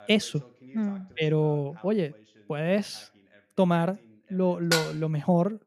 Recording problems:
voice in the background; faint; throughout; 25 dB below the speech
clattering dishes; loud; at 4.5 s; peak level with the speech

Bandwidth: 14.5 kHz